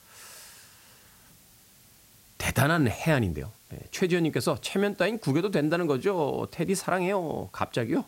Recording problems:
hiss; faint; throughout; 25 dB below the speech

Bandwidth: 16 kHz